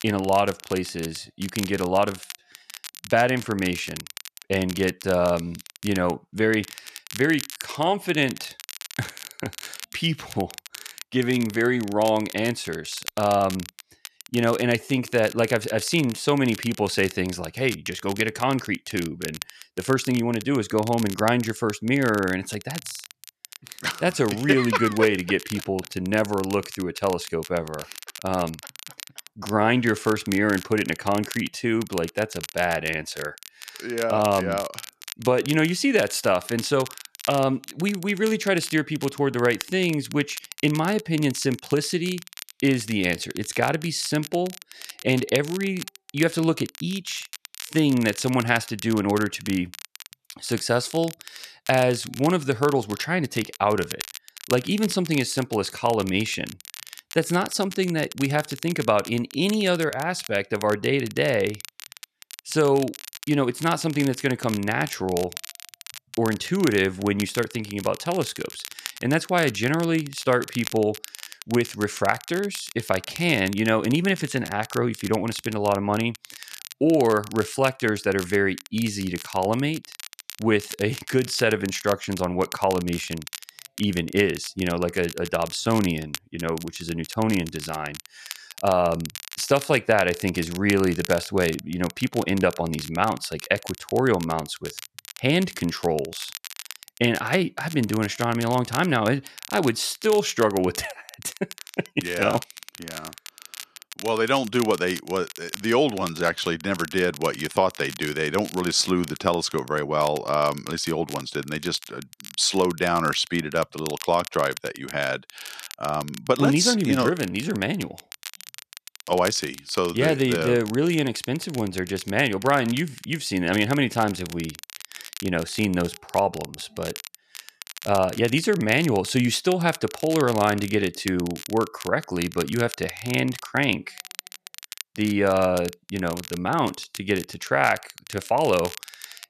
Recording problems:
crackle, like an old record; noticeable; 15 dB below the speech

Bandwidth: 14 kHz